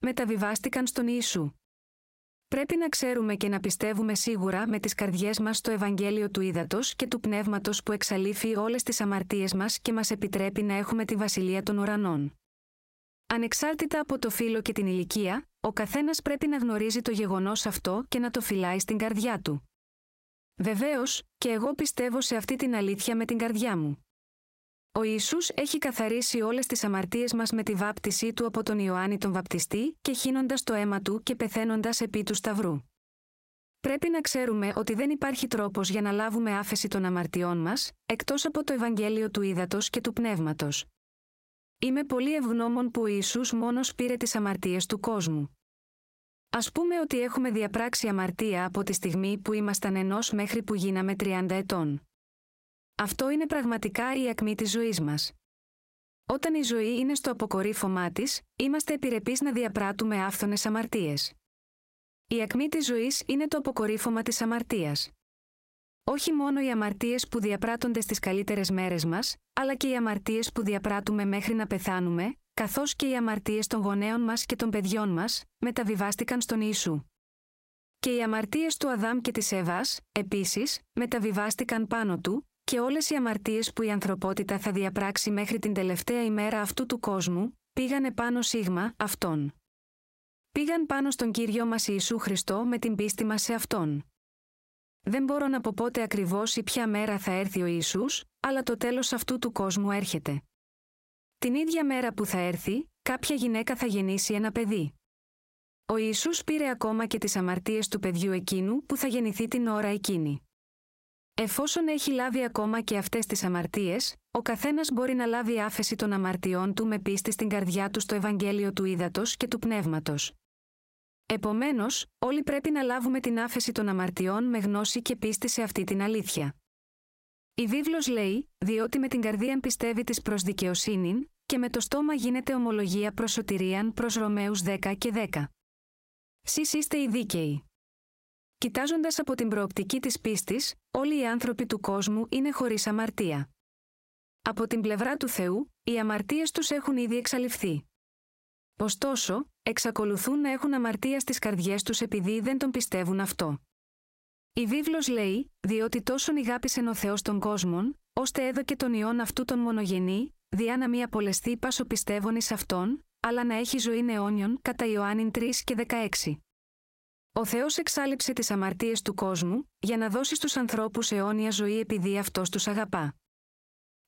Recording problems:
squashed, flat; heavily

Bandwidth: 16 kHz